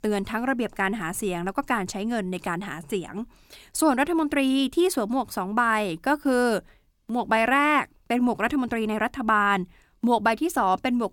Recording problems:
none

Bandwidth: 17 kHz